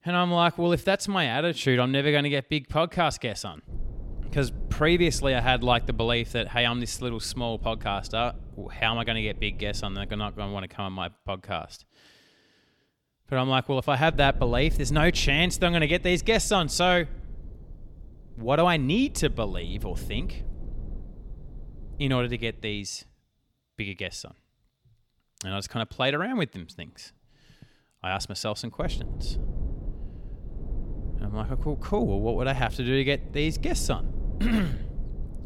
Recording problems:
low rumble; faint; from 3.5 to 11 s, from 14 to 23 s and from 29 s on; 25 dB below the speech

